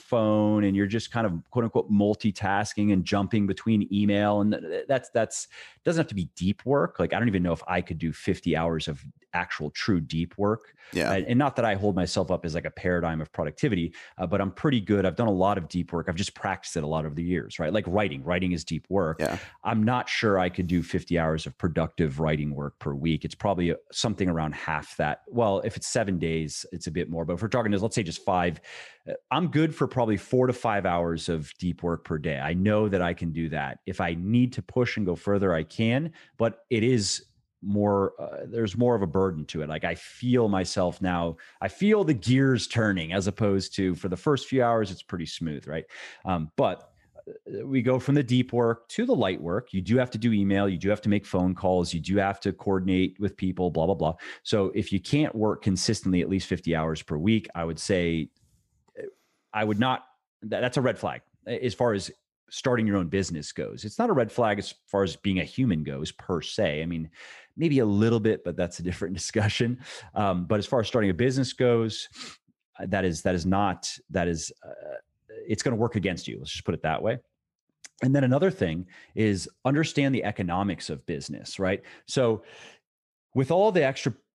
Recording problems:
none

